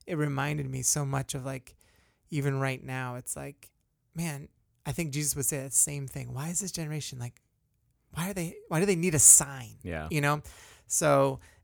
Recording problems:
none

